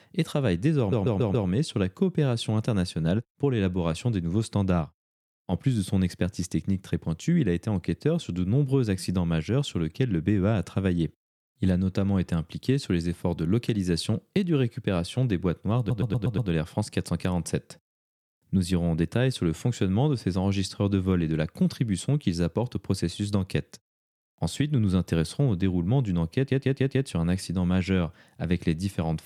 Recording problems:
audio stuttering; at 1 s, at 16 s and at 26 s

